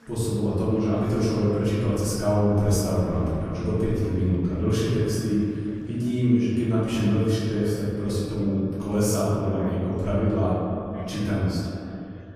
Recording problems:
room echo; strong; dies away in 2 s
off-mic speech; far
echo of what is said; noticeable; throughout; 150 ms later, 15 dB below the speech
chatter from many people; faint; throughout; 25 dB below the speech

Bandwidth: 15 kHz